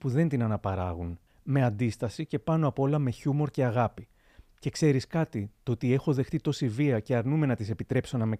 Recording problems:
none

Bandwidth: 15 kHz